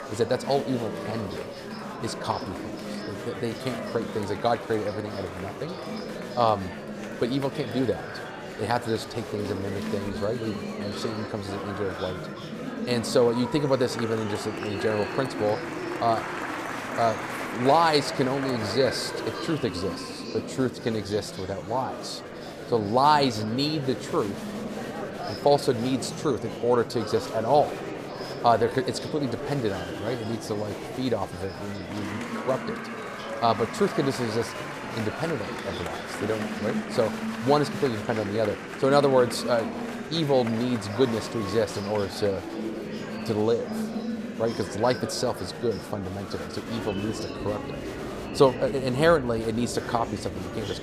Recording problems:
murmuring crowd; loud; throughout; 7 dB below the speech

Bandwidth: 15 kHz